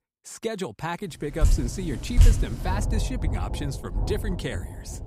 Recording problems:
rain or running water; very loud; from 1.5 s on; 5 dB above the speech

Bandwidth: 15.5 kHz